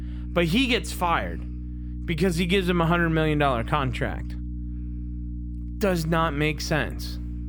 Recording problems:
electrical hum; faint; throughout; 60 Hz, 20 dB below the speech

